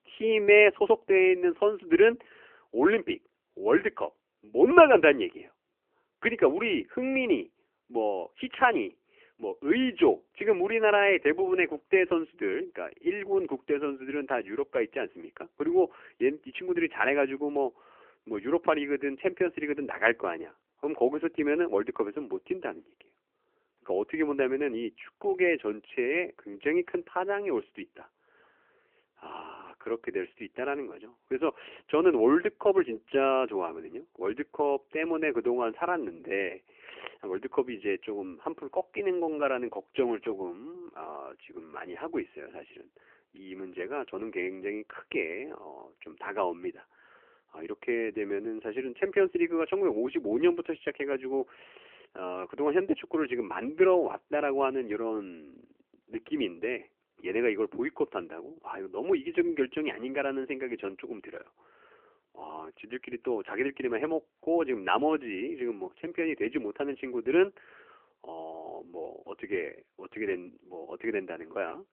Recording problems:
phone-call audio; nothing above 3 kHz

